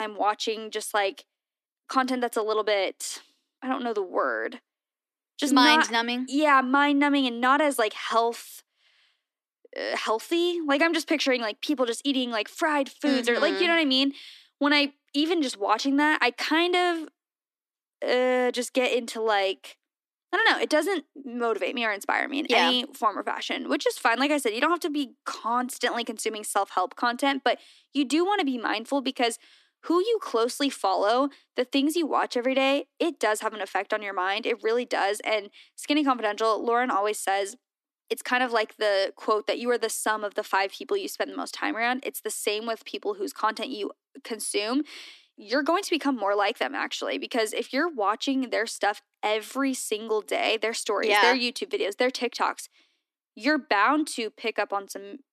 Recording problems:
thin; very slightly; fading below 250 Hz
abrupt cut into speech; at the start

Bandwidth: 13.5 kHz